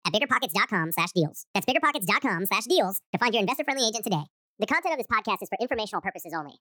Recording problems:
wrong speed and pitch; too fast and too high; 1.5 times normal speed

